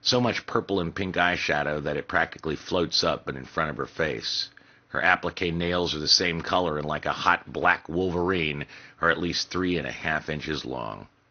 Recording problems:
garbled, watery; slightly
high frequencies cut off; slight; nothing above 6.5 kHz

